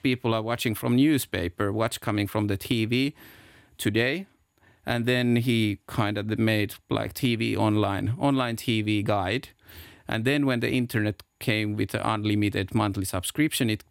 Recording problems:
none

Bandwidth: 16.5 kHz